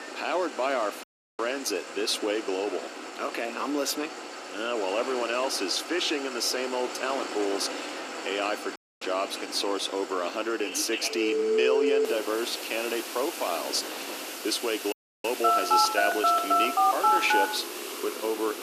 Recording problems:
thin; somewhat; fading below 300 Hz
alarms or sirens; very loud; throughout; 2 dB above the speech
traffic noise; loud; throughout; 10 dB below the speech
wind noise on the microphone; occasional gusts; 15 dB below the speech
audio cutting out; at 1 s, at 9 s and at 15 s

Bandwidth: 14.5 kHz